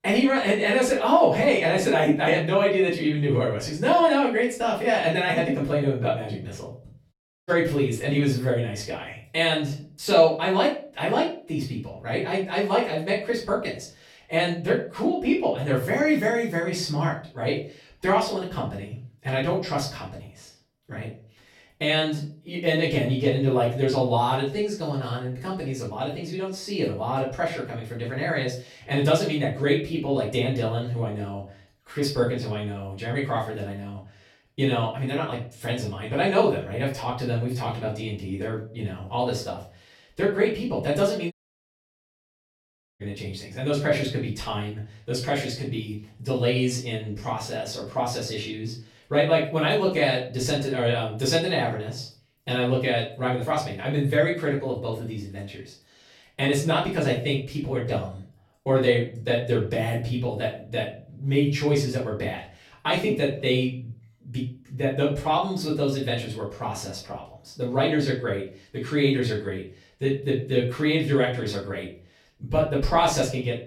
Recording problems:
off-mic speech; far
room echo; slight; dies away in 0.3 s
audio cutting out; at 7 s and at 41 s for 1.5 s

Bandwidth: 16.5 kHz